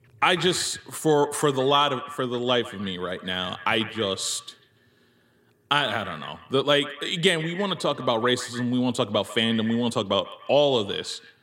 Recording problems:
echo of what is said; noticeable; throughout; 140 ms later, 15 dB below the speech

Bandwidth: 16 kHz